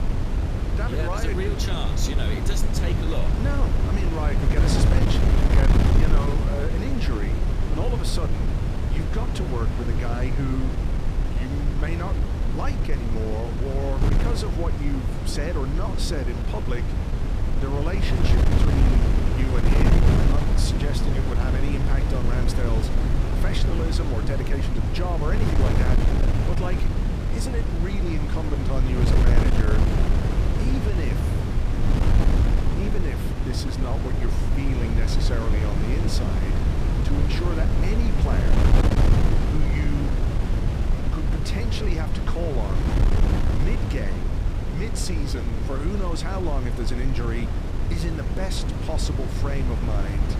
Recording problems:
wind noise on the microphone; heavy; 1 dB above the speech

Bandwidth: 14.5 kHz